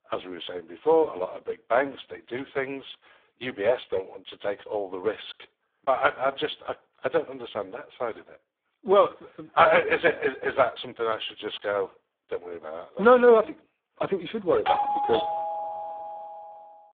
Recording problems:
phone-call audio; poor line
doorbell; loud; from 15 to 16 s; peak 1 dB above the speech

